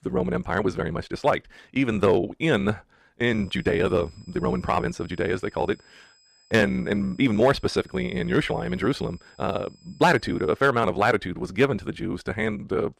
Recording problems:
wrong speed, natural pitch; too fast; 1.7 times normal speed
high-pitched whine; faint; from 3.5 to 11 s; 5 kHz, 30 dB below the speech

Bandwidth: 14.5 kHz